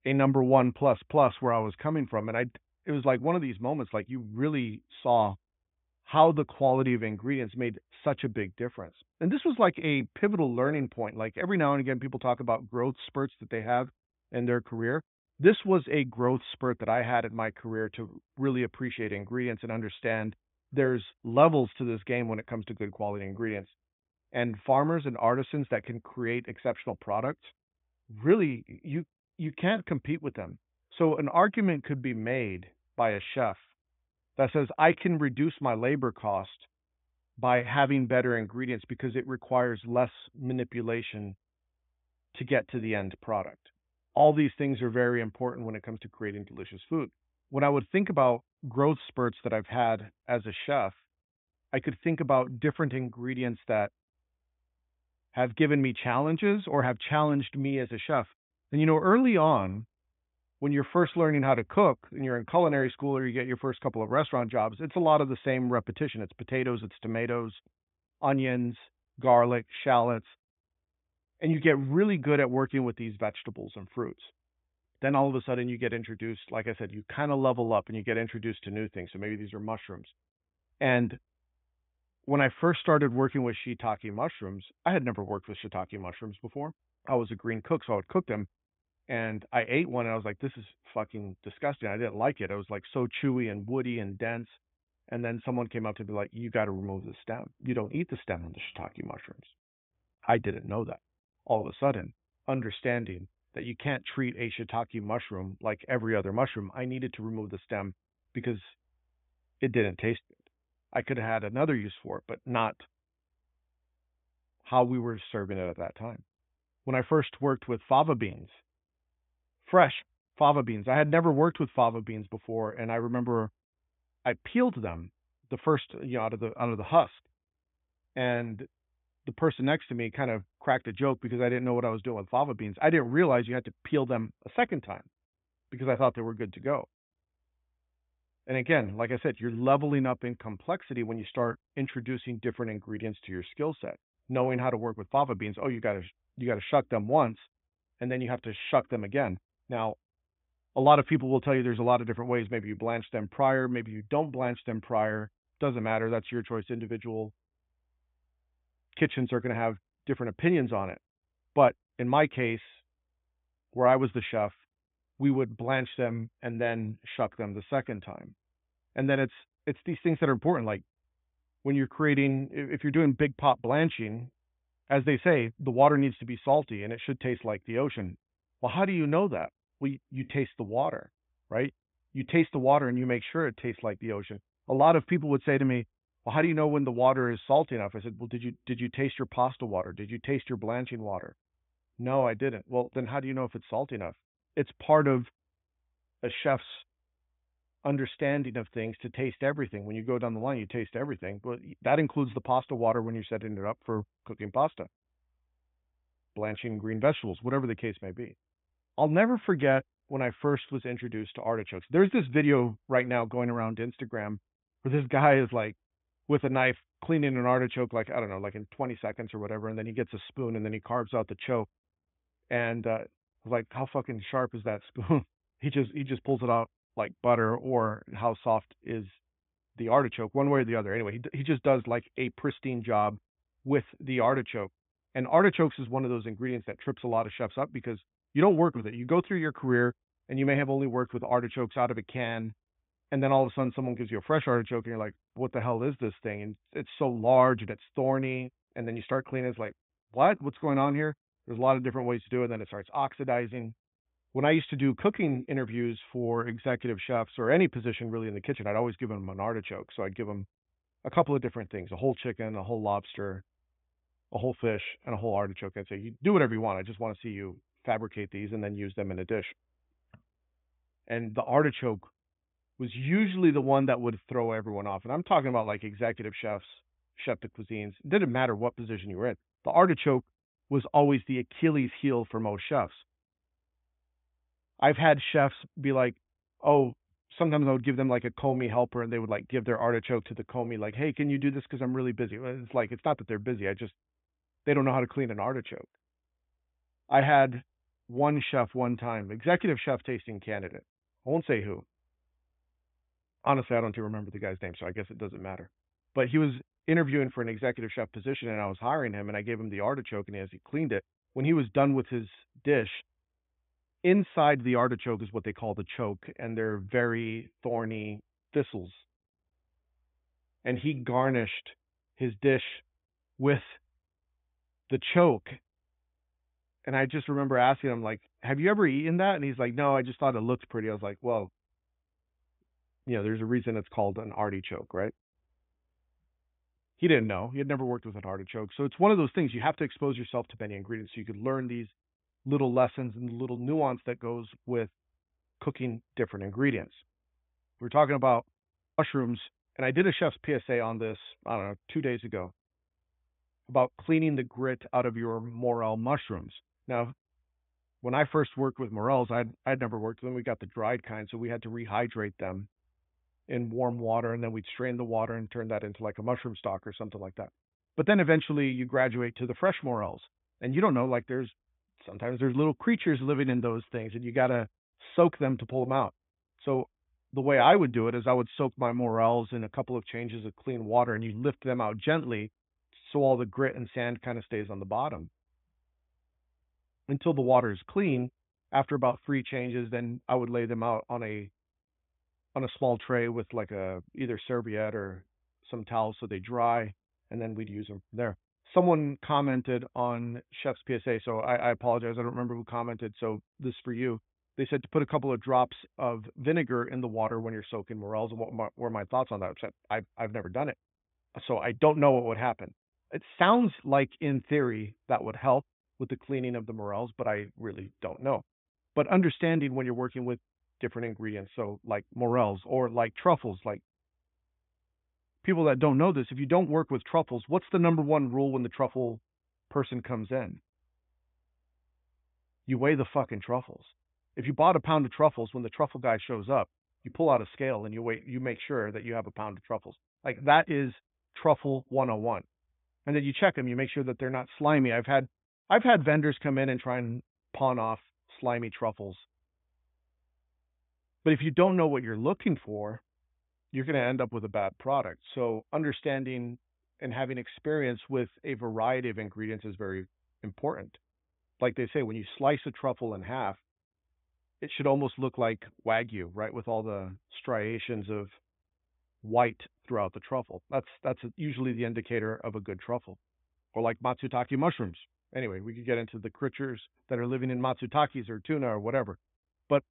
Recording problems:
high frequencies cut off; severe; nothing above 3.5 kHz

